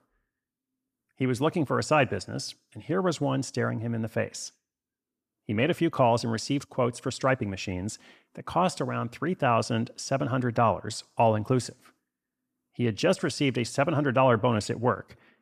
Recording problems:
none

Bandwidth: 14.5 kHz